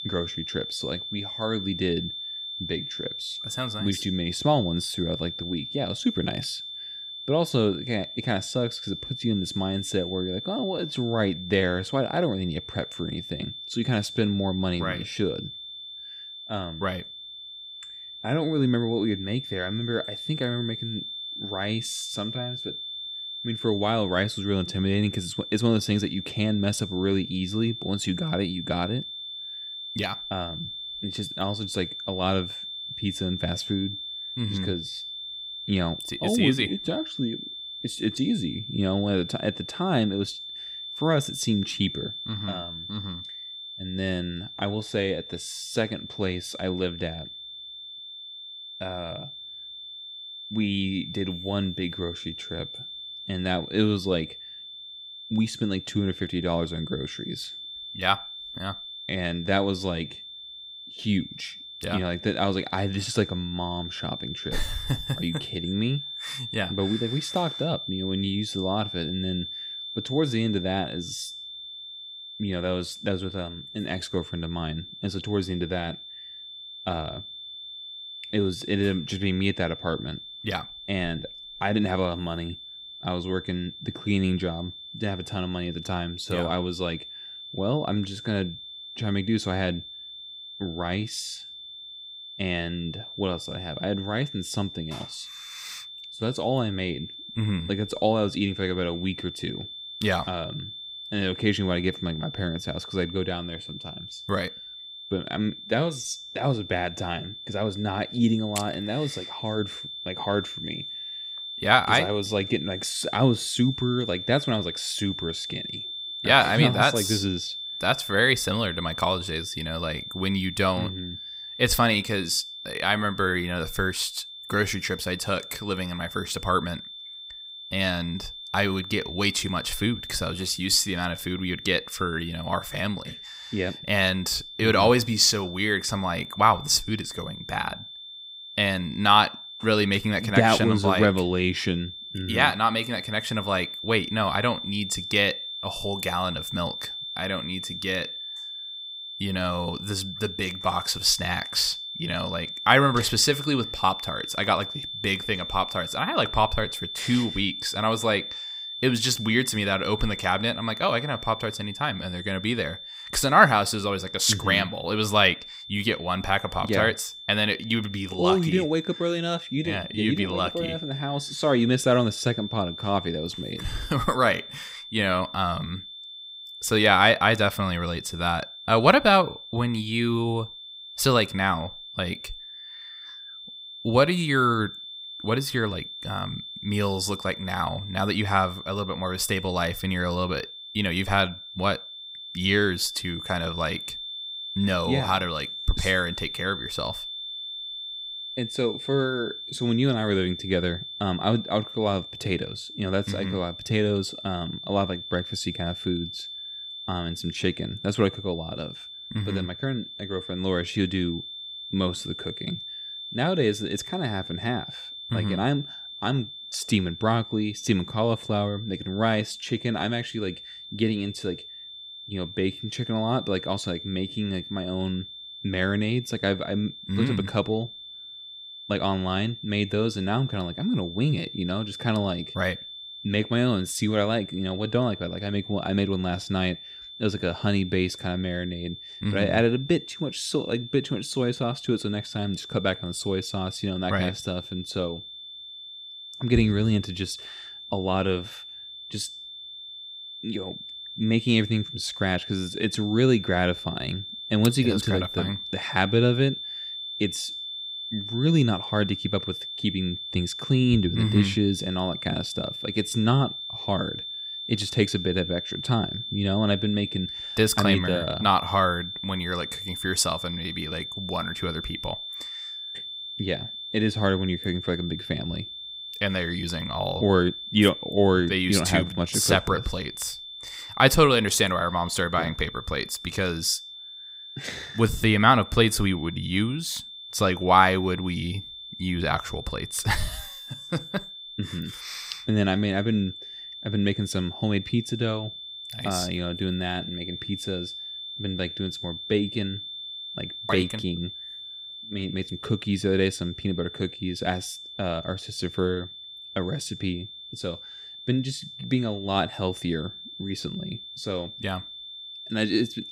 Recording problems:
high-pitched whine; loud; throughout; 3.5 kHz, 9 dB below the speech

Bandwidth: 15.5 kHz